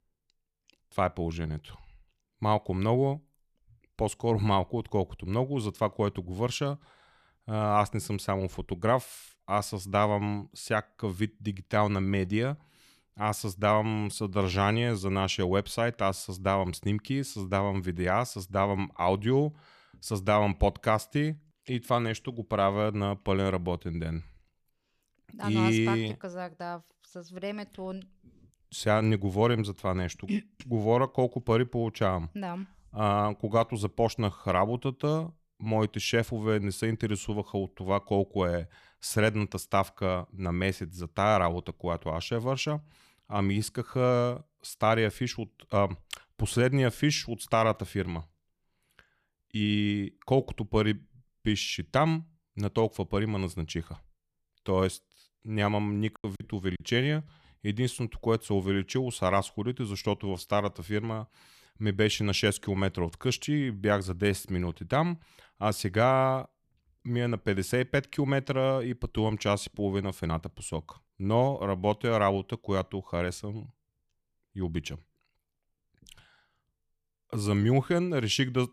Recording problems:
choppy; very; at 56 s; 13% of the speech affected

